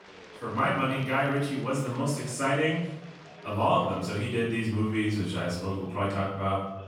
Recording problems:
off-mic speech; far
room echo; noticeable; dies away in 0.8 s
chatter from many people; faint; throughout; 20 dB below the speech

